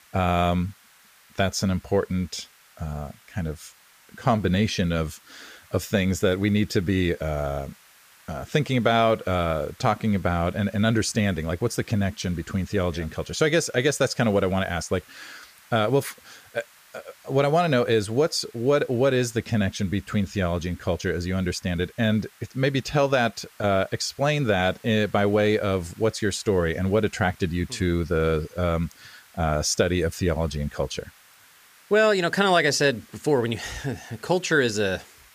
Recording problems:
hiss; faint; throughout; 25 dB below the speech

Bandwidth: 15 kHz